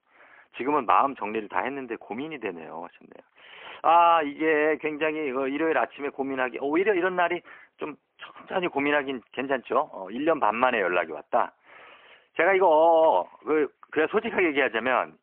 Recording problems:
phone-call audio; poor line

